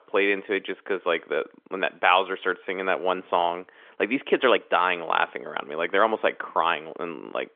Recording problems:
phone-call audio; nothing above 3.5 kHz

